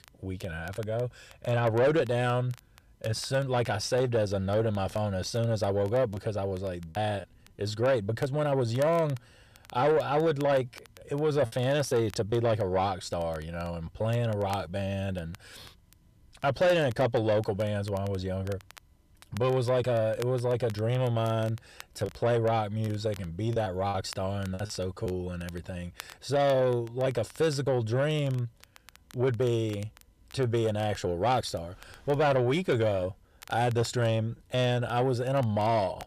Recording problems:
distortion; slight; 10 dB below the speech
crackle, like an old record; faint; 25 dB below the speech
choppy; very; at 6 s, at 11 s and from 22 to 25 s; 5% of the speech affected

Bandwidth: 14.5 kHz